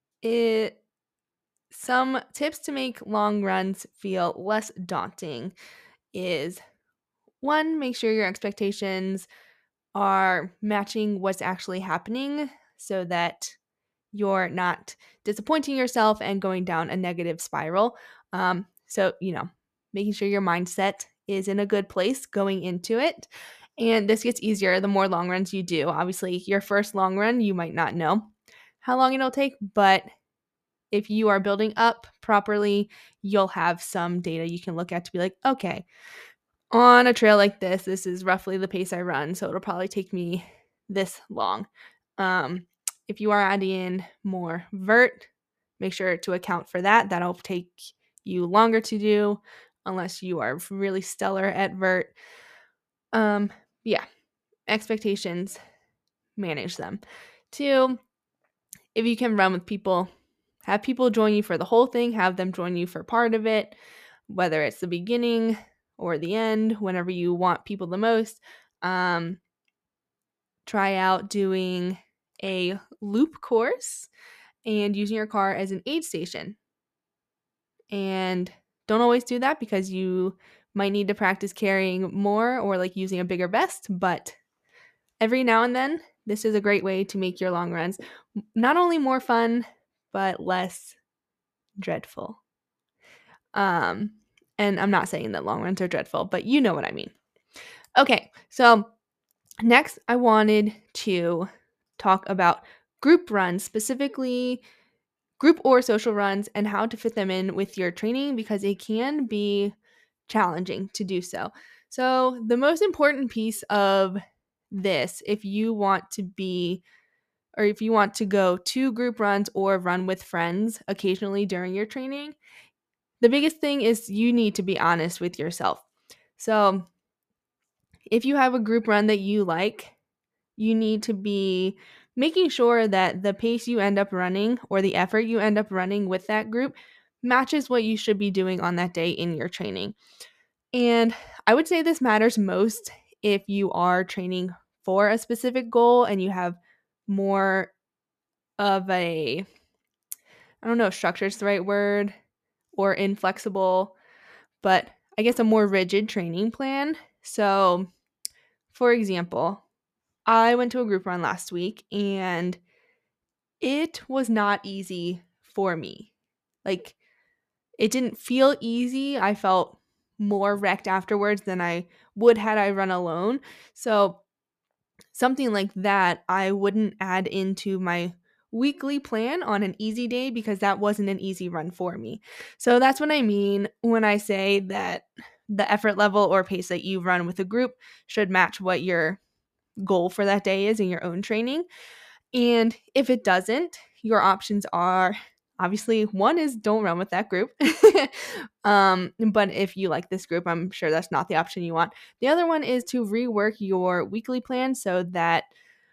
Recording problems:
none

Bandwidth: 14.5 kHz